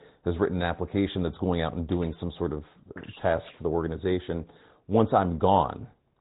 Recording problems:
high frequencies cut off; severe; nothing above 4 kHz
garbled, watery; slightly

